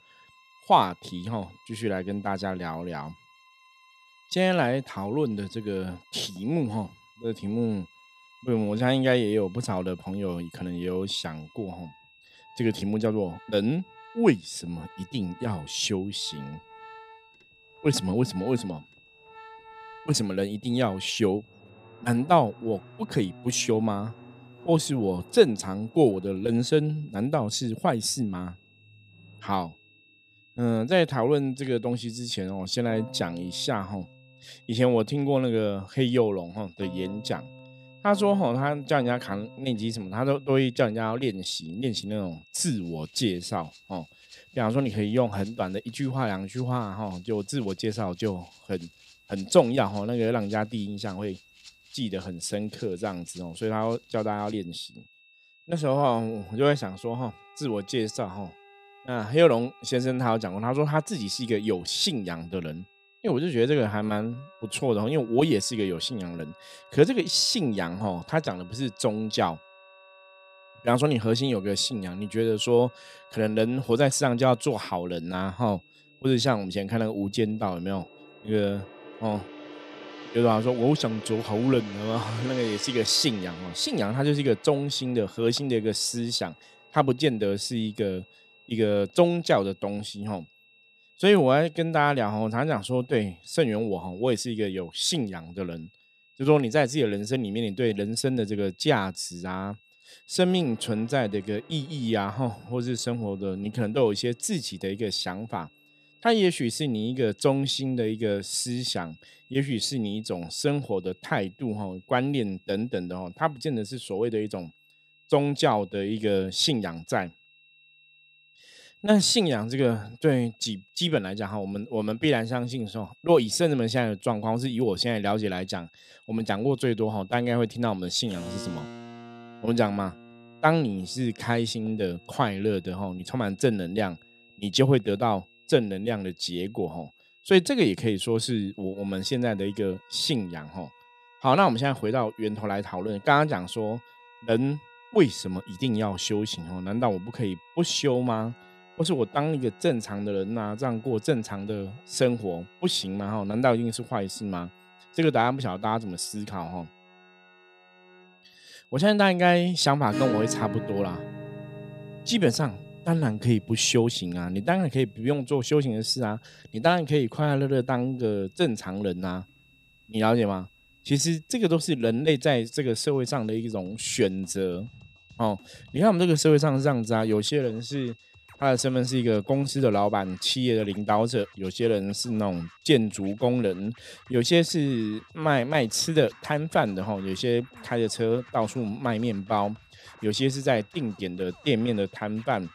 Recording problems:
high-pitched whine; faint; throughout; 2.5 kHz, 30 dB below the speech
background music; faint; throughout; 20 dB below the speech

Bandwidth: 15 kHz